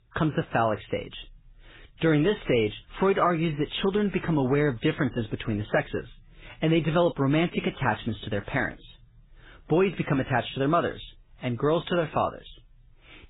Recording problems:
garbled, watery; badly
high frequencies cut off; severe; nothing above 4 kHz

